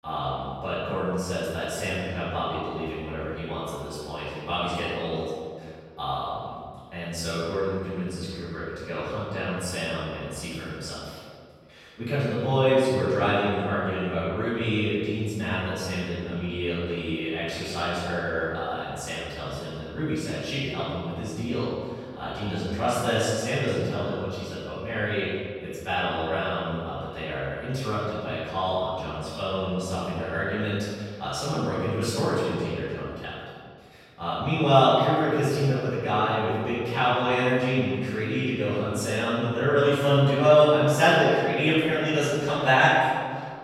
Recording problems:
room echo; strong; dies away in 1.8 s
off-mic speech; far

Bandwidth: 16 kHz